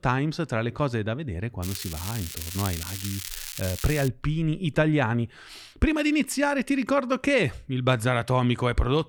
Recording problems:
crackling; loud; from 1.5 to 4 s; 8 dB below the speech

